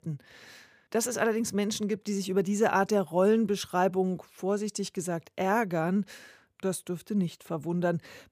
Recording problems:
none

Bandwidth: 15 kHz